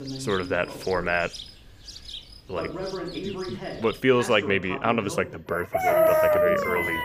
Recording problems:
animal sounds; very loud; throughout; 3 dB above the speech
voice in the background; loud; throughout; 10 dB below the speech

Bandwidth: 15 kHz